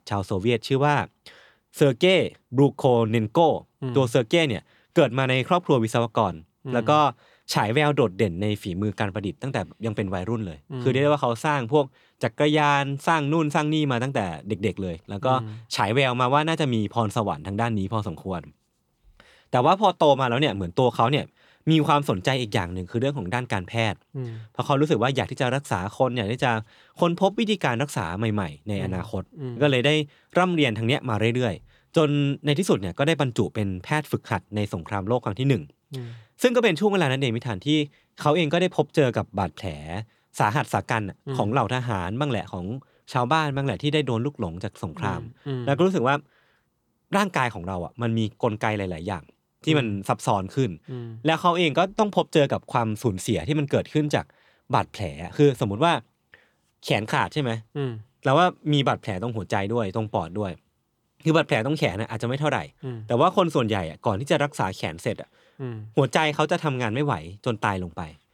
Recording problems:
none

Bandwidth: 18.5 kHz